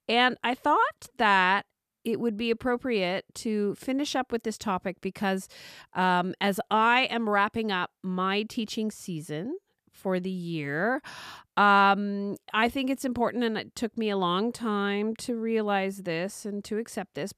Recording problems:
none

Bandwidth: 14.5 kHz